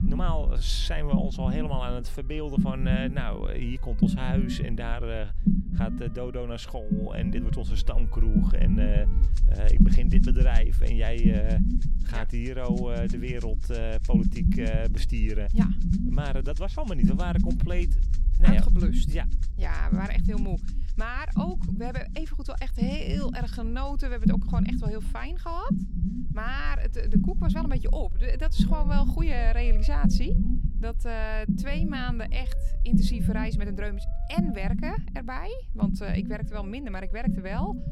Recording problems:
low rumble; loud; throughout; 1 dB below the speech
background music; noticeable; throughout; 20 dB below the speech

